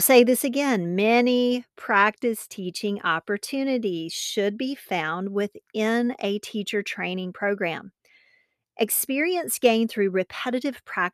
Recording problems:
abrupt cut into speech; at the start

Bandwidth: 14 kHz